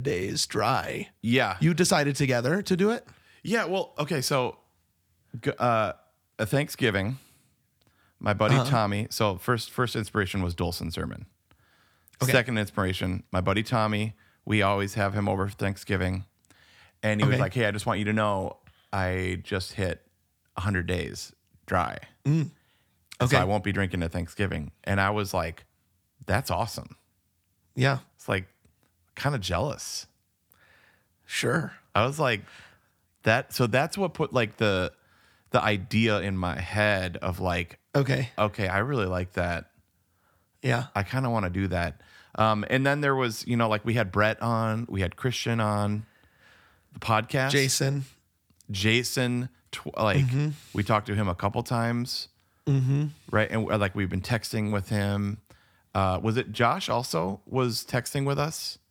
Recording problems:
abrupt cut into speech; at the start

